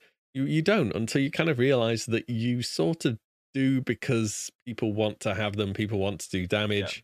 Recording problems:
none

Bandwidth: 14.5 kHz